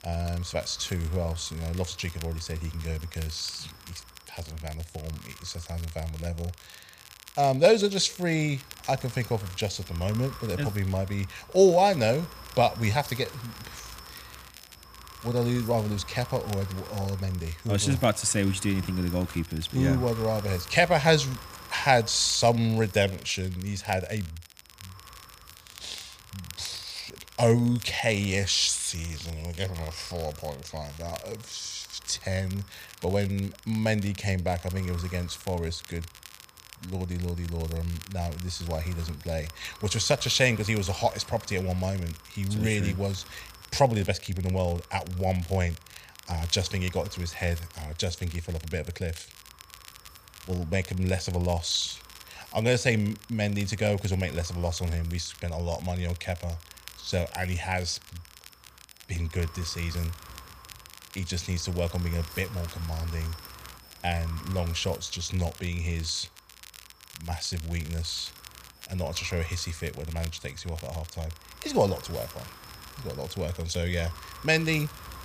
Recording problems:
wind noise on the microphone; occasional gusts; 20 dB below the speech
crackle, like an old record; noticeable; 20 dB below the speech

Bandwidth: 15 kHz